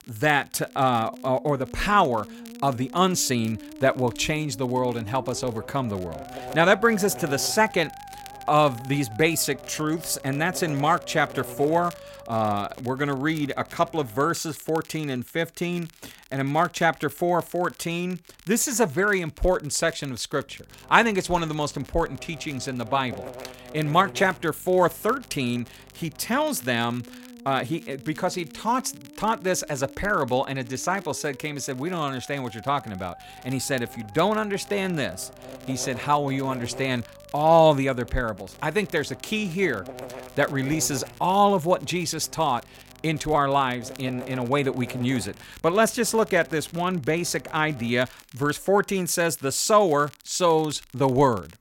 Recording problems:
electrical hum; noticeable; from 5 to 14 s, from 20 to 26 s and from 33 to 48 s; 50 Hz, 20 dB below the speech
background music; faint; throughout; 20 dB below the speech
crackle, like an old record; faint; 25 dB below the speech

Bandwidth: 16.5 kHz